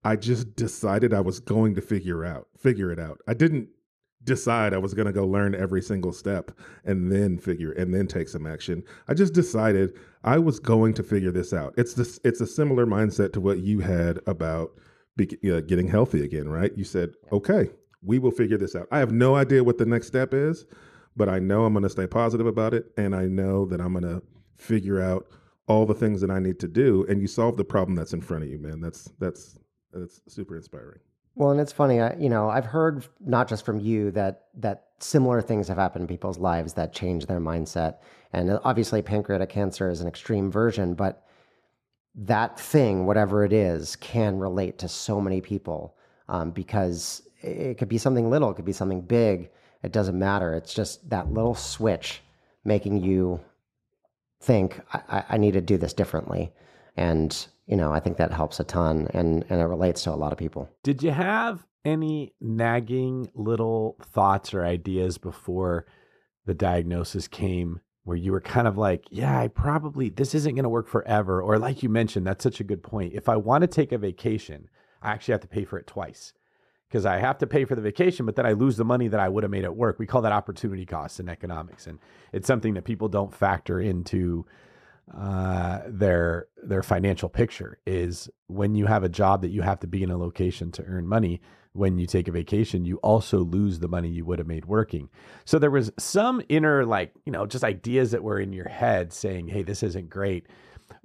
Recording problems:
muffled; slightly; fading above 1.5 kHz

